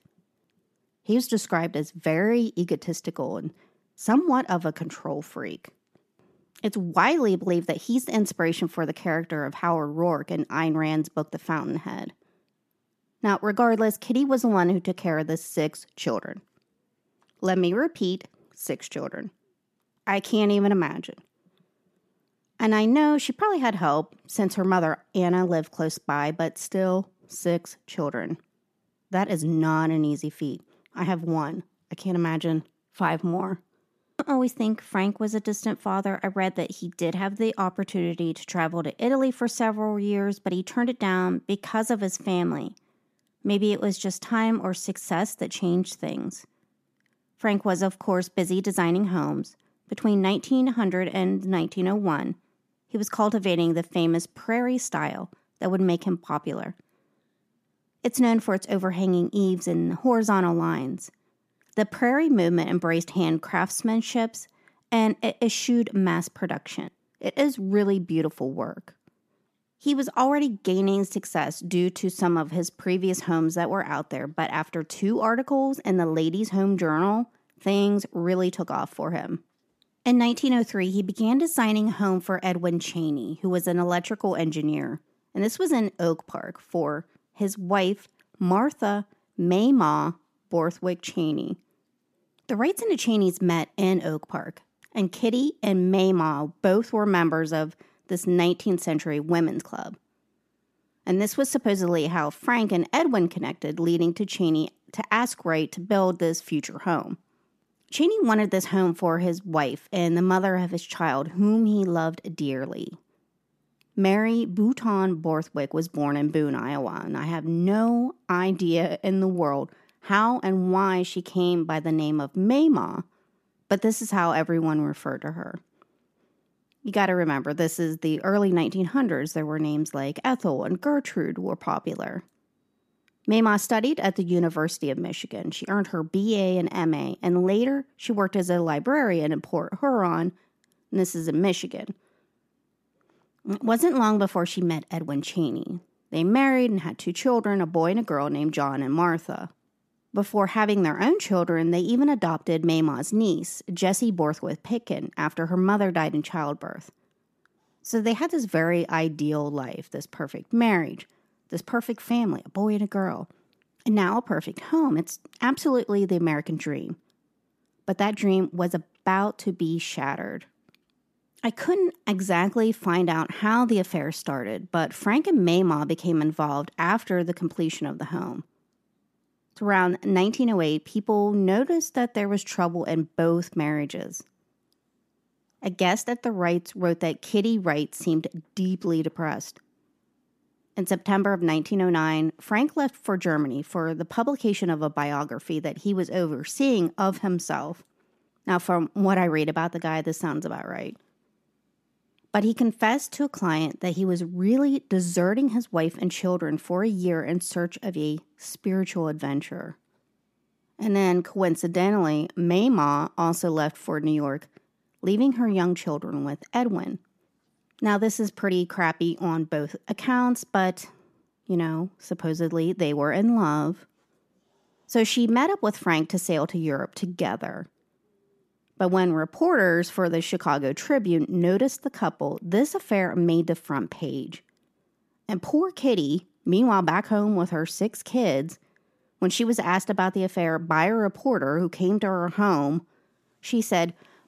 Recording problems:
uneven, jittery; slightly; from 38 s to 3:39

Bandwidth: 14.5 kHz